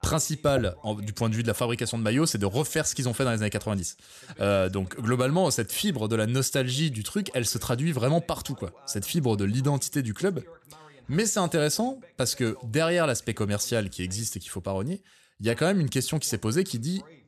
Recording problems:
voice in the background; faint; throughout; 25 dB below the speech

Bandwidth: 13.5 kHz